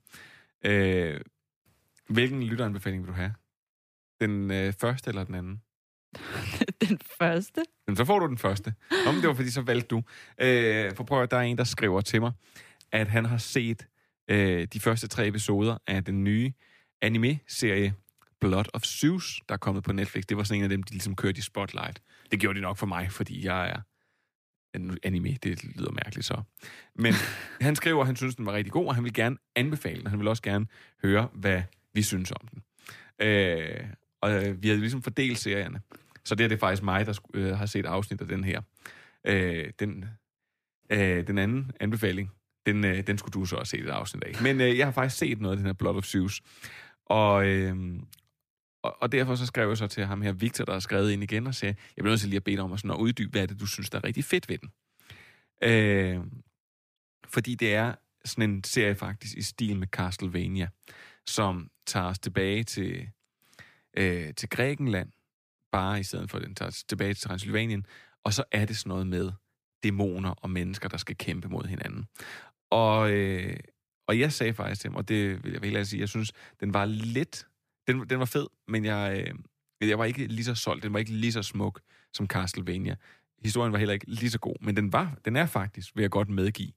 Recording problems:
none

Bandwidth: 15 kHz